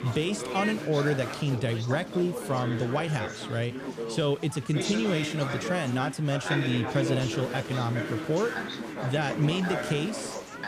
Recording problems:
chatter from many people; loud; throughout; 5 dB below the speech

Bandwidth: 15 kHz